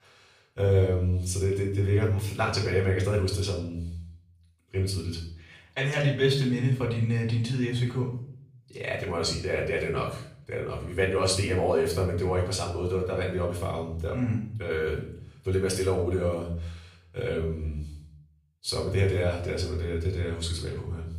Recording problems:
off-mic speech; far
room echo; slight; dies away in 0.5 s

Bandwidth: 15 kHz